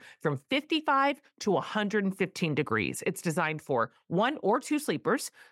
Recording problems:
none

